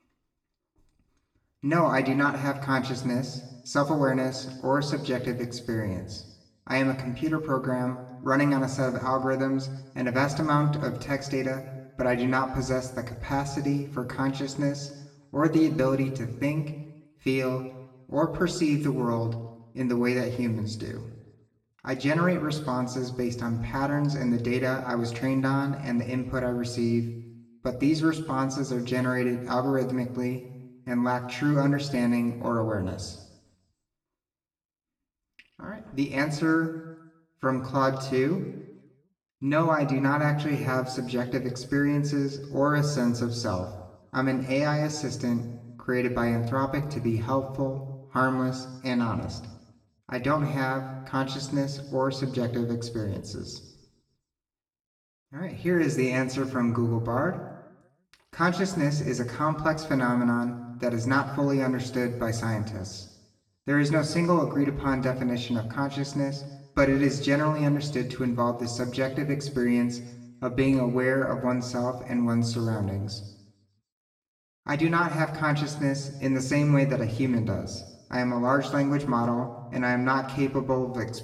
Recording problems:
room echo; slight; dies away in 0.8 s
off-mic speech; somewhat distant

